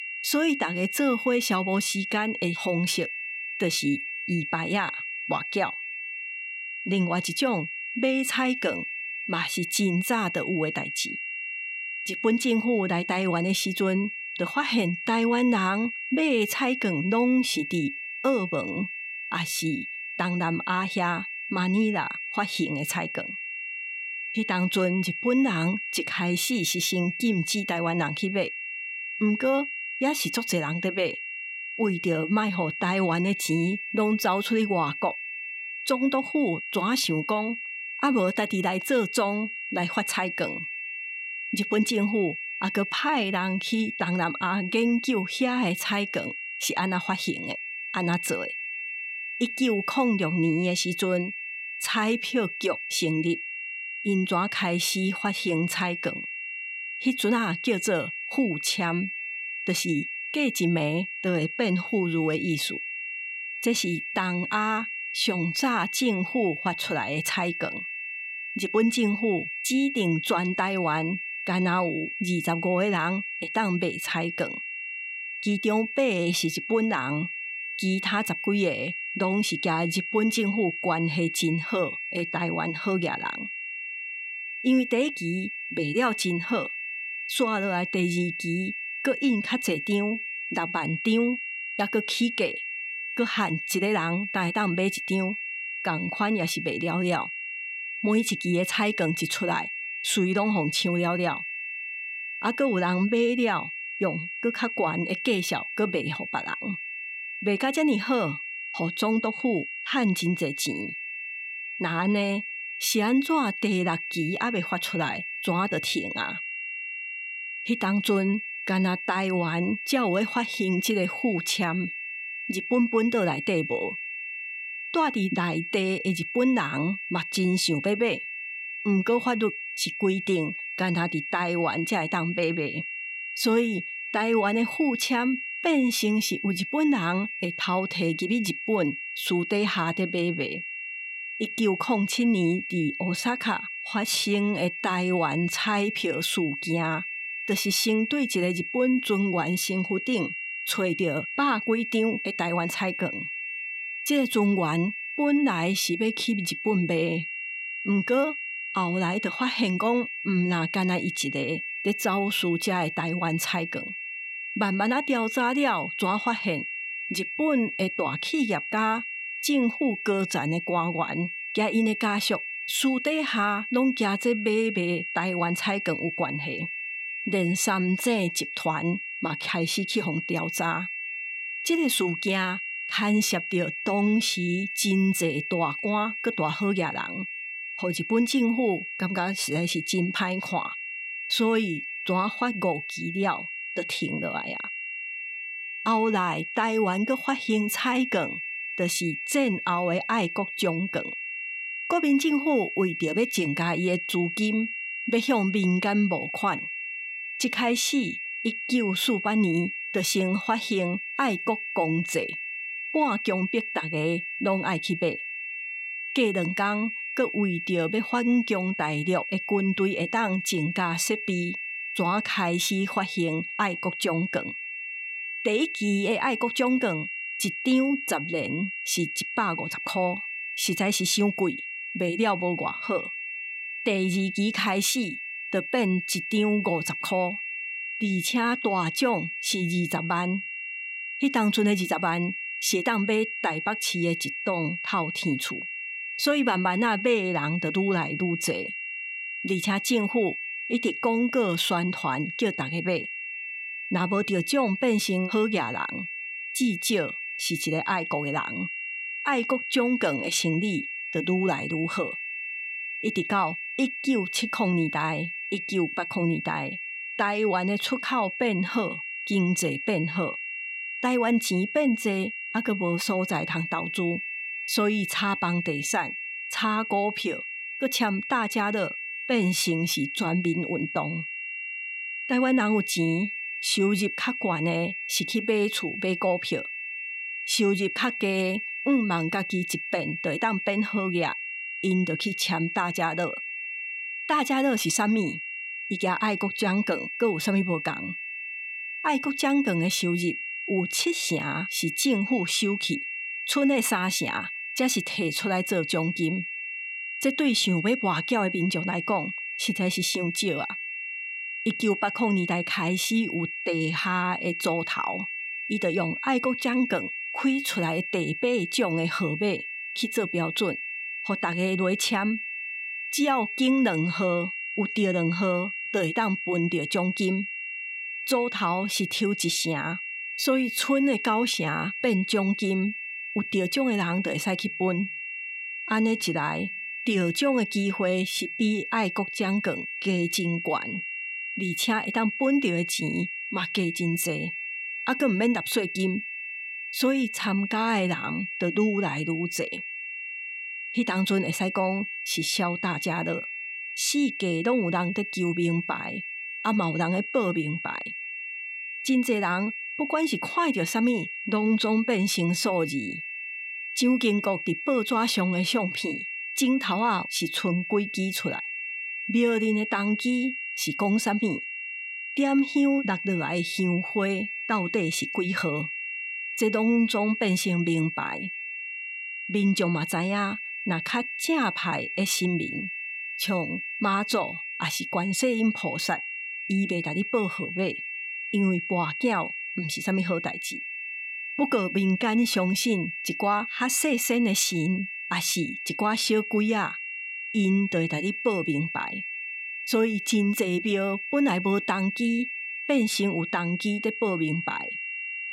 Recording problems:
high-pitched whine; loud; throughout; 2.5 kHz, 5 dB below the speech

